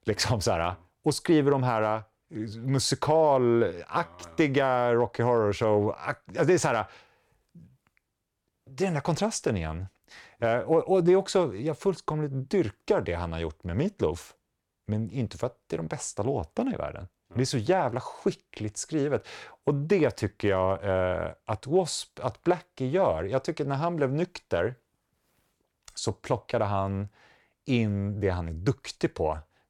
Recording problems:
none

